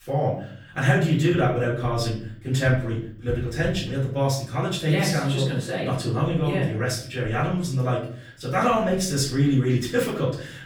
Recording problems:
off-mic speech; far
room echo; slight; dies away in 0.5 s

